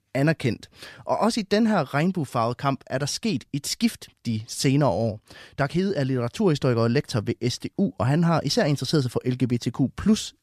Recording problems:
none

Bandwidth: 14.5 kHz